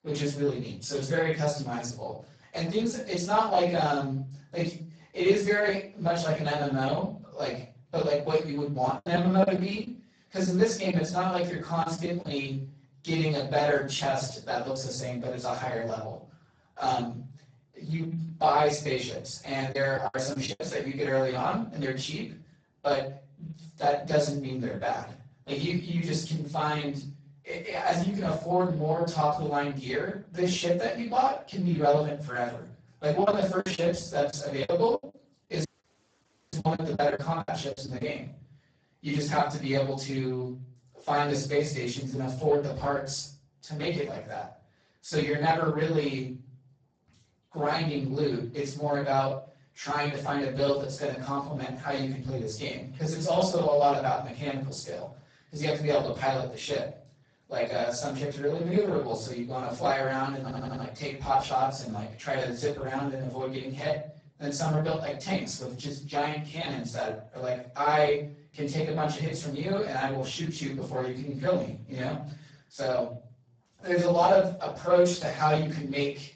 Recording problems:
off-mic speech; far
garbled, watery; badly; nothing above 8 kHz
room echo; noticeable; dies away in 0.5 s
choppy; very; from 9 to 12 s, at 20 s and from 33 to 38 s; 16% of the speech affected
audio cutting out; at 36 s for 1 s
audio stuttering; at 1:00

